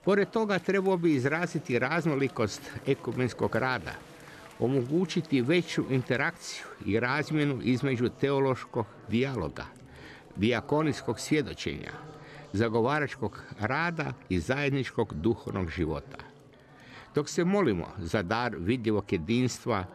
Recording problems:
chatter from many people; faint; throughout; 20 dB below the speech

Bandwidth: 13.5 kHz